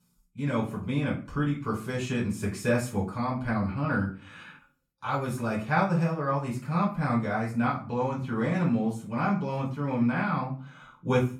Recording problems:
off-mic speech; far
room echo; slight; dies away in 0.3 s

